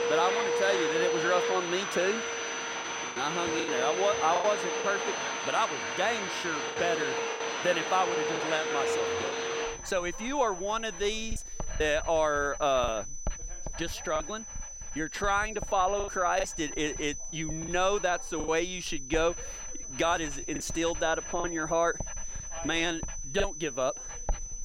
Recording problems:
high-pitched whine; loud; throughout; 6 kHz, 9 dB below the speech
household noises; loud; throughout; 2 dB below the speech
background chatter; faint; throughout; 2 voices, 25 dB below the speech
choppy; very; 5% of the speech affected

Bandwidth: 16 kHz